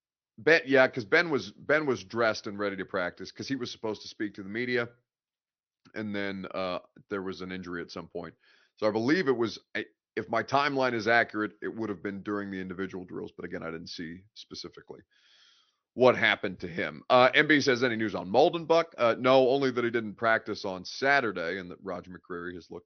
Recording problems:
high frequencies cut off; noticeable; nothing above 6 kHz

